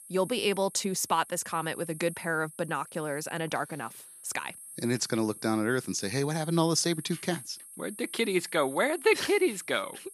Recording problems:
high-pitched whine; noticeable; throughout; 11 kHz, 15 dB below the speech

